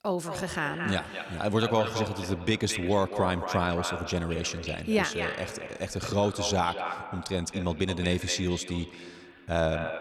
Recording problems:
echo of what is said; strong; throughout; 220 ms later, 8 dB below the speech

